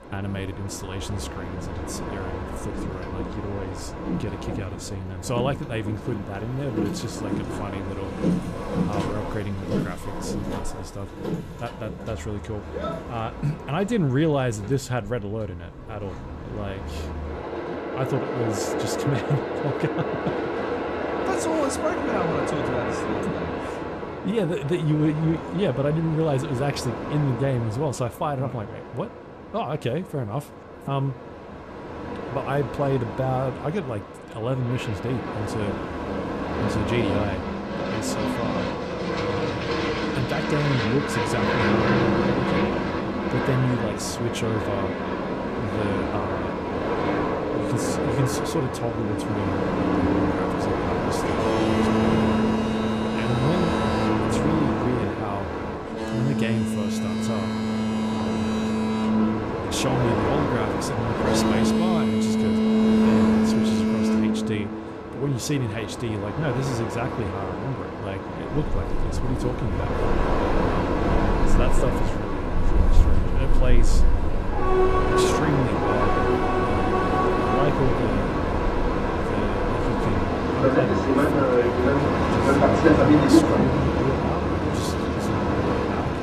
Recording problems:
train or aircraft noise; very loud; throughout; 4 dB above the speech

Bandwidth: 14.5 kHz